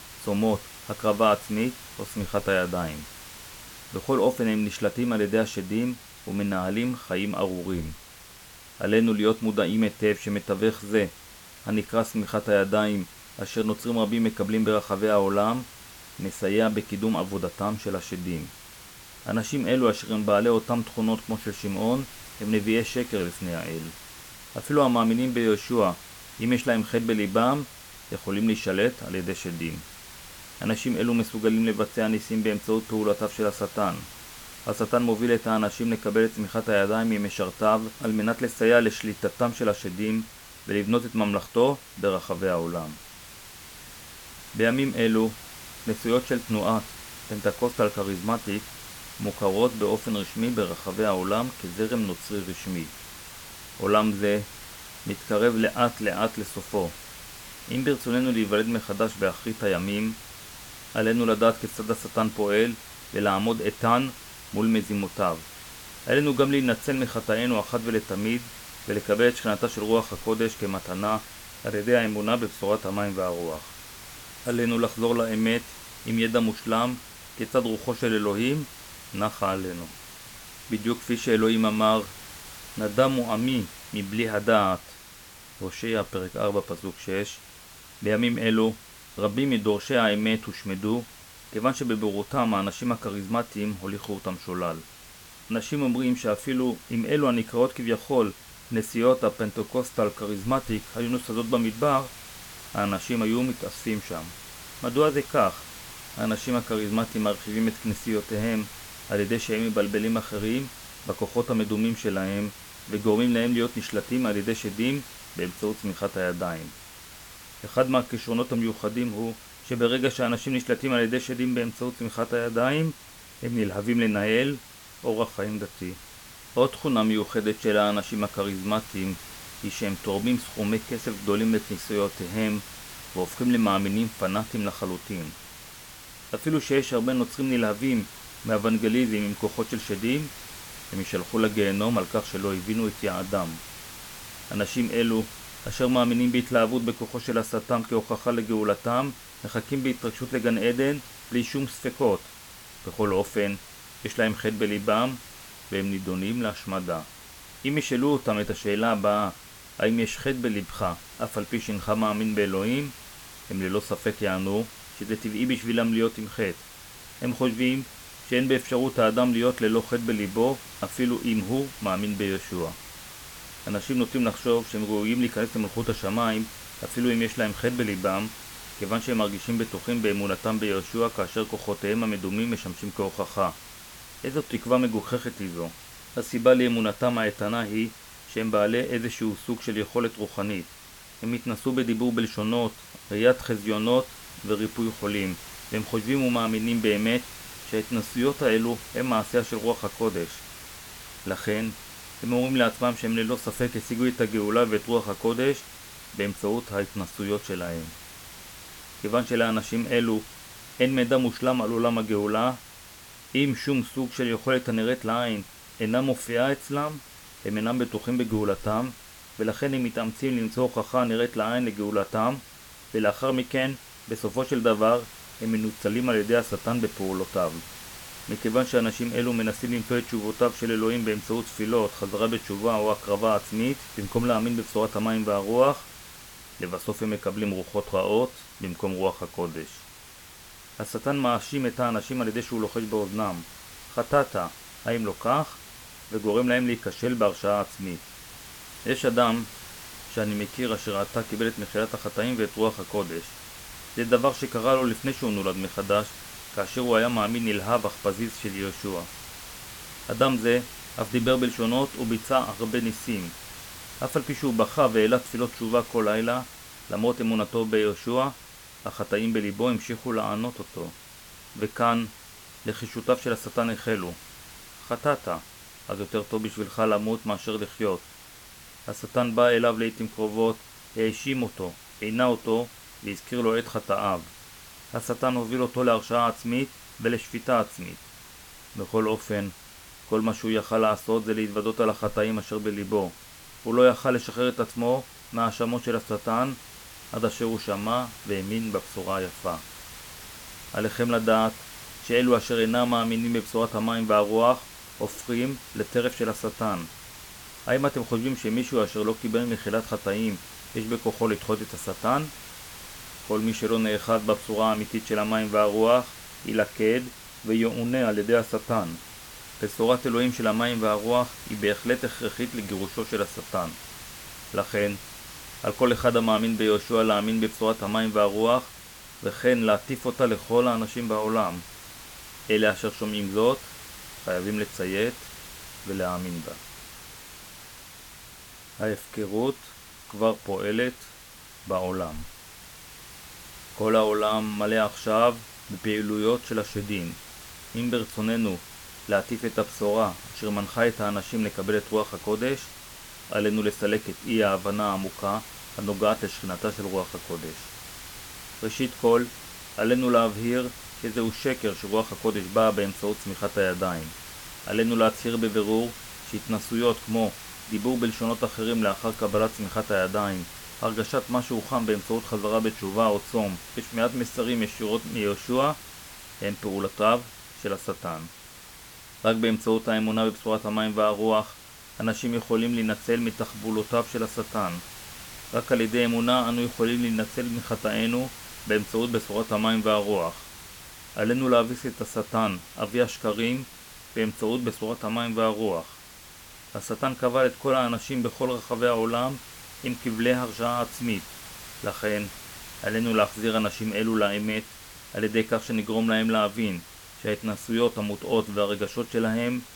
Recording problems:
hiss; noticeable; throughout; 15 dB below the speech

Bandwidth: 18 kHz